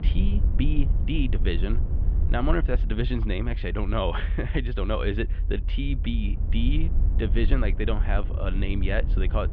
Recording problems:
muffled; very; fading above 3 kHz
low rumble; noticeable; throughout; 15 dB below the speech

